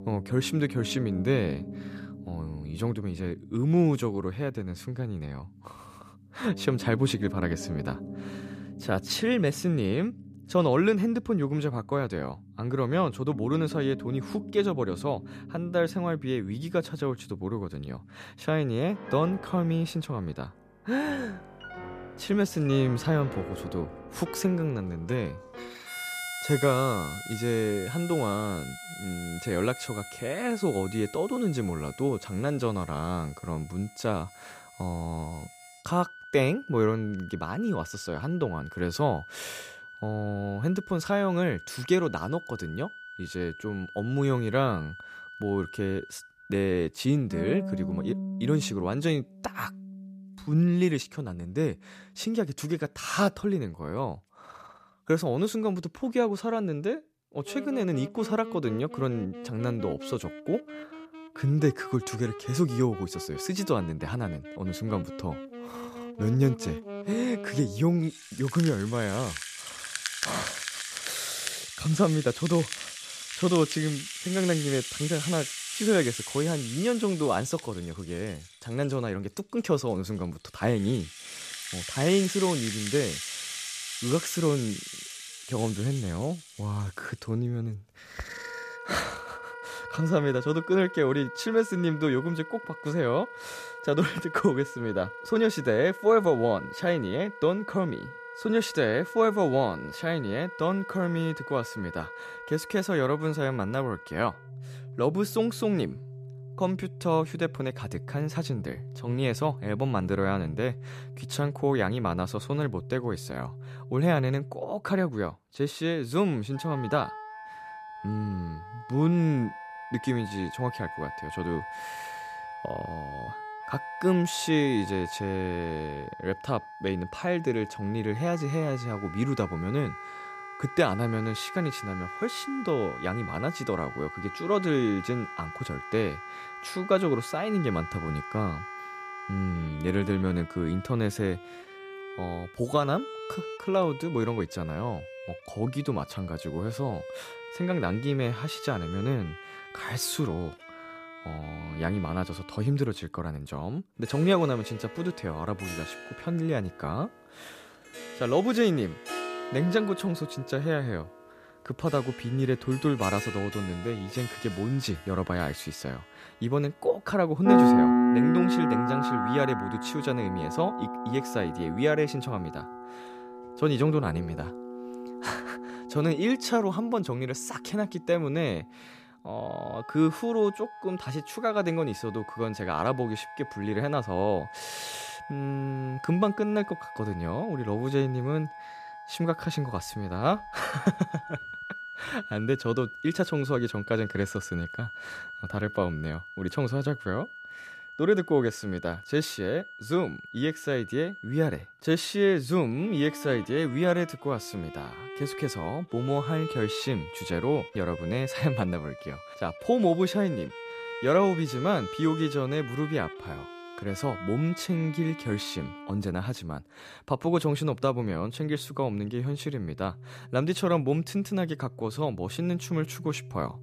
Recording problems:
background music; loud; throughout; 8 dB below the speech

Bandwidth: 14.5 kHz